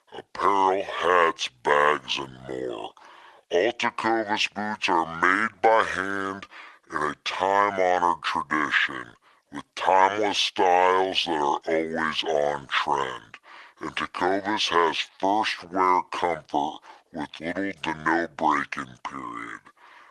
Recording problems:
thin; very; fading below 650 Hz
wrong speed and pitch; too slow and too low; 0.6 times normal speed
garbled, watery; slightly; nothing above 12.5 kHz

